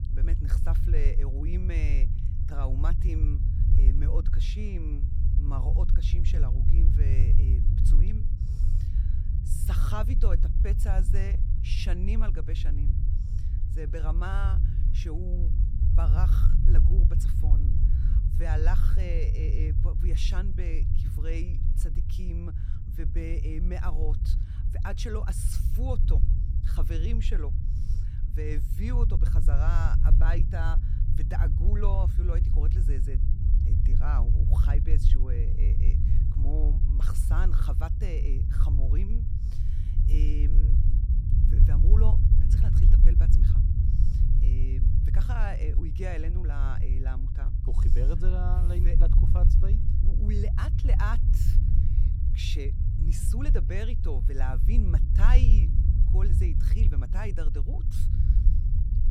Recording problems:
low rumble; loud; throughout; 3 dB below the speech

